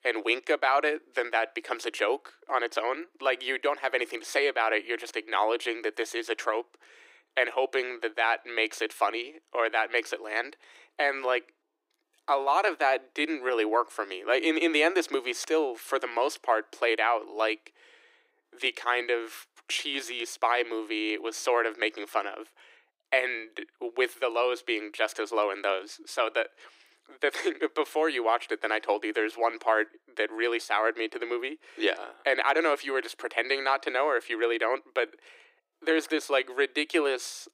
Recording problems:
thin; very; fading below 300 Hz

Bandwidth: 15.5 kHz